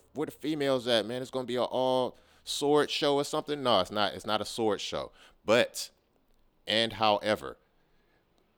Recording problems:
none

